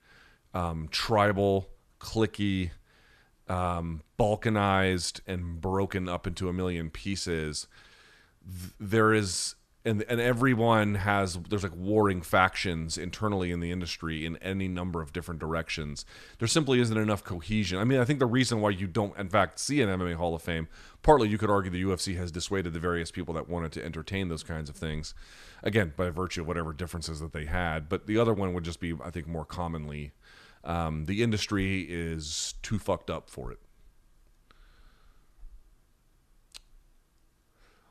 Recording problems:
none

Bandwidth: 13.5 kHz